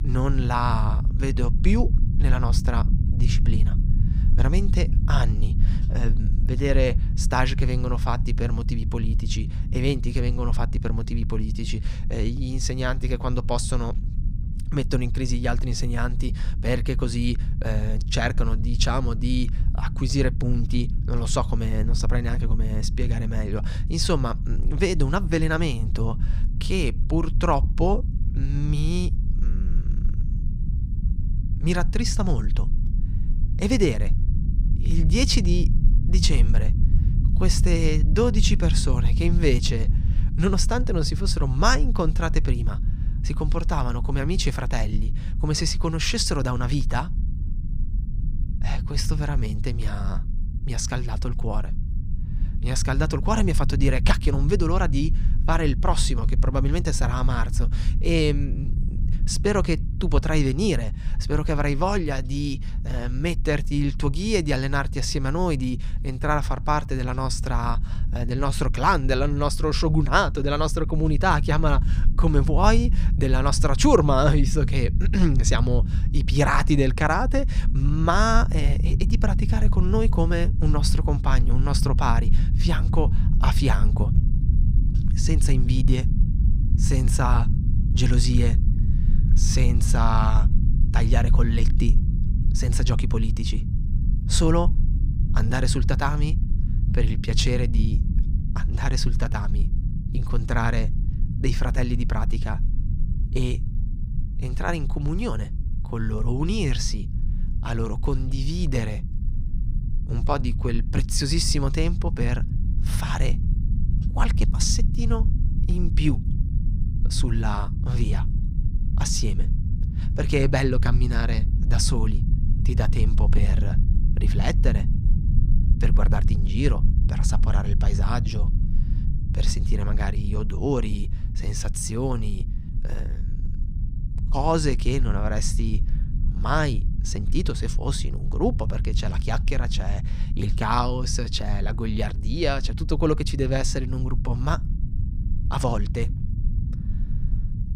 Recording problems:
low rumble; noticeable; throughout; 15 dB below the speech

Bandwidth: 15.5 kHz